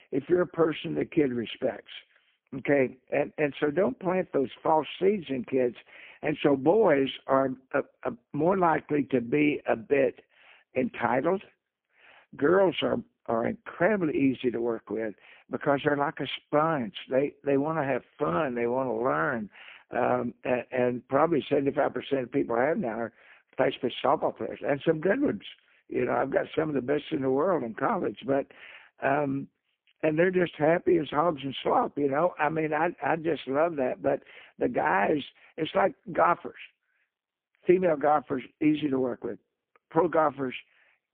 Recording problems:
phone-call audio; poor line; nothing above 3.5 kHz

